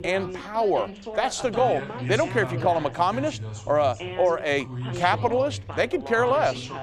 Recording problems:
background chatter; loud; throughout; 3 voices, 9 dB below the speech

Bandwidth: 15.5 kHz